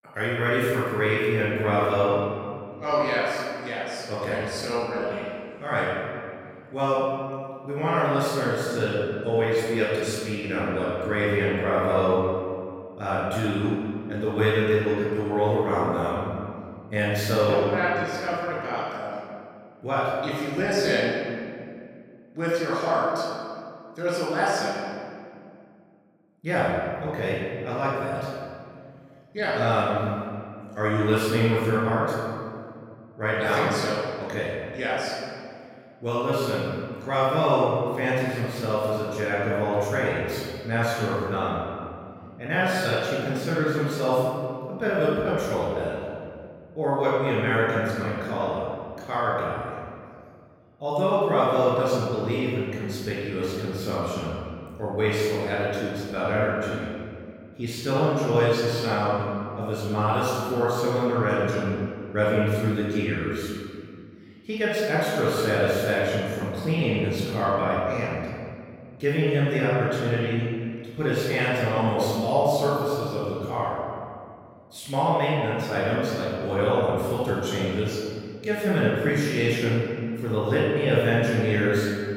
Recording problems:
room echo; strong; dies away in 2.1 s
off-mic speech; far

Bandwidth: 16 kHz